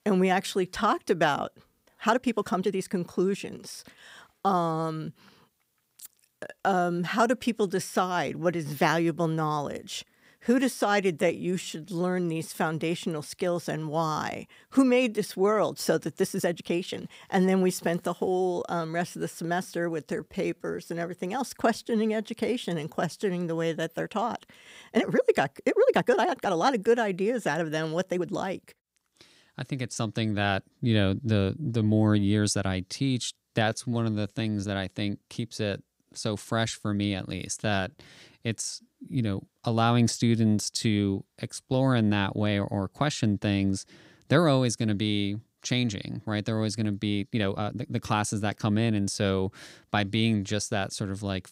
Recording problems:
uneven, jittery; strongly; from 2 to 48 s

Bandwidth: 15.5 kHz